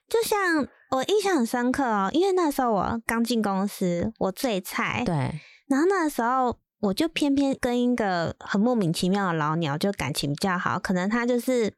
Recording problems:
none

